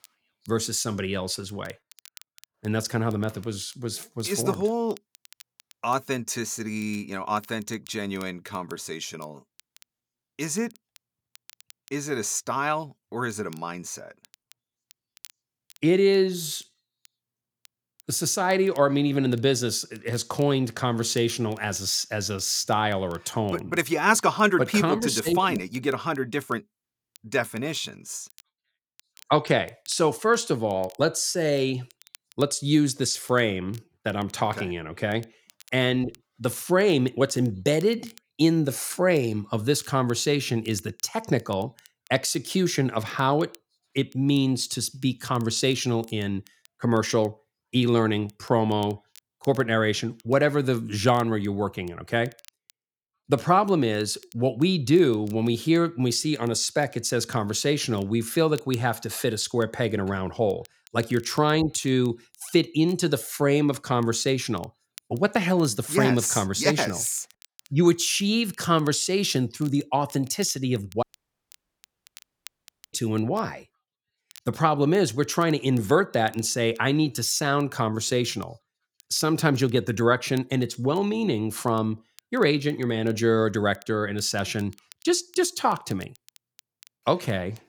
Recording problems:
crackle, like an old record; faint; 30 dB below the speech
audio cutting out; at 1:11 for 2 s

